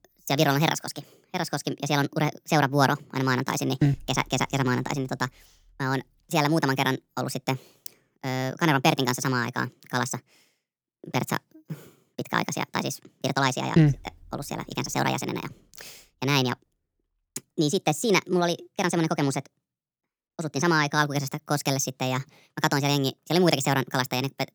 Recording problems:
wrong speed and pitch; too fast and too high; 1.5 times normal speed

